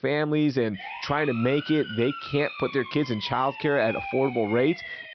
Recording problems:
high frequencies cut off; noticeable; nothing above 5.5 kHz
siren; noticeable; from 0.5 s on; peak 7 dB below the speech

